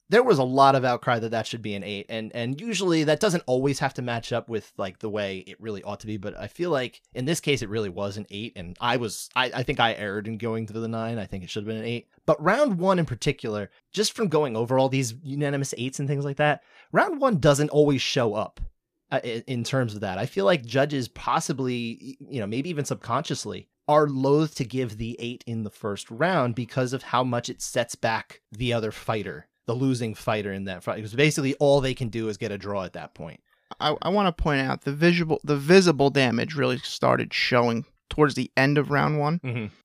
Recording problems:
none

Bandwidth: 15 kHz